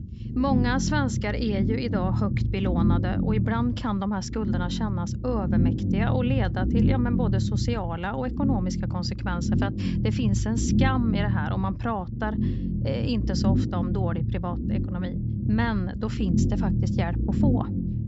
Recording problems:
high frequencies cut off; noticeable; nothing above 8 kHz
low rumble; loud; throughout; 4 dB below the speech

